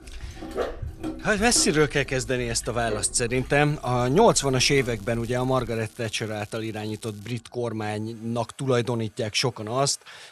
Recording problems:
household noises; noticeable; throughout; 15 dB below the speech
crackling; faint; from 4.5 to 7.5 s; 25 dB below the speech
dog barking; noticeable; until 5.5 s; peak 7 dB below the speech

